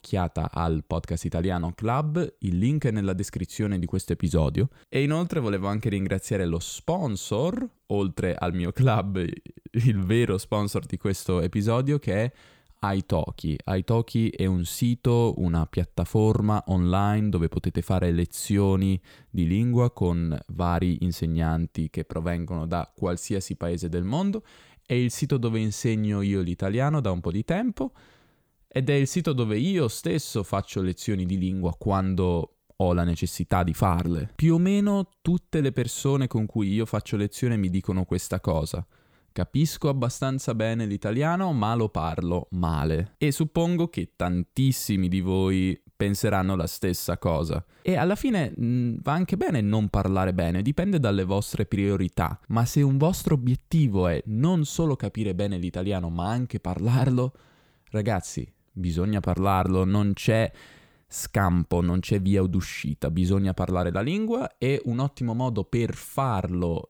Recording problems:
none

